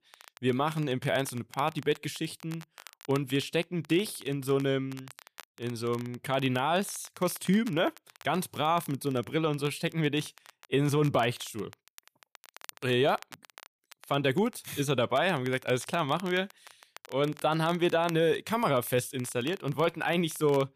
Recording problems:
crackle, like an old record; faint; 20 dB below the speech

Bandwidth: 14.5 kHz